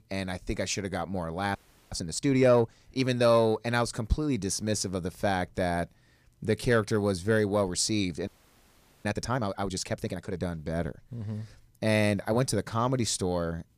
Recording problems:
audio freezing; at 1.5 s and at 8.5 s for 1 s

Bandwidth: 15 kHz